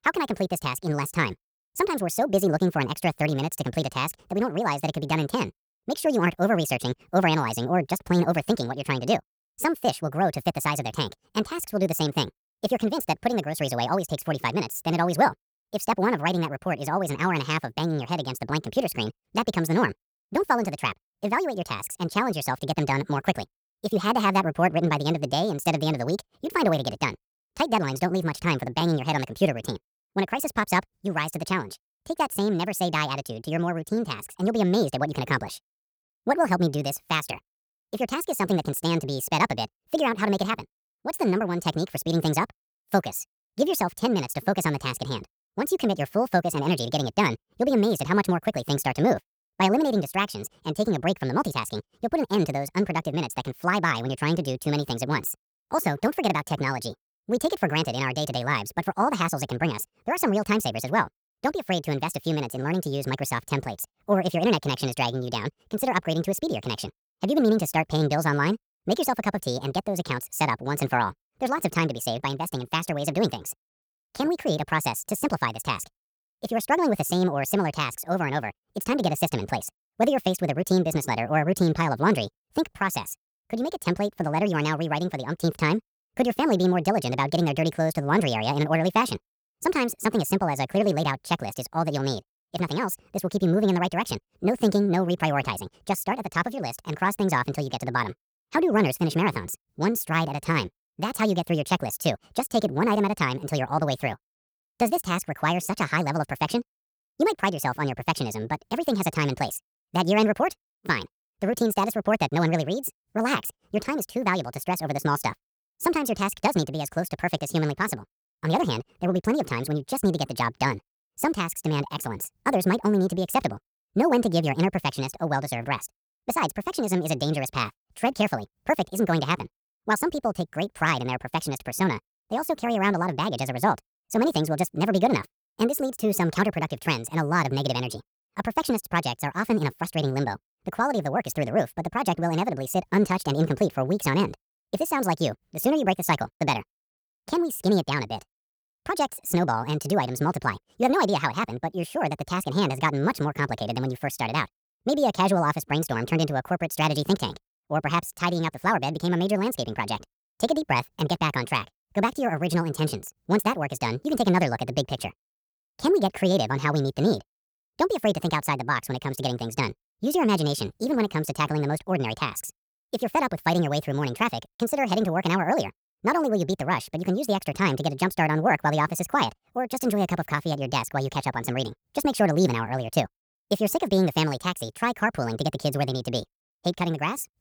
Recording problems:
wrong speed and pitch; too fast and too high; 1.6 times normal speed

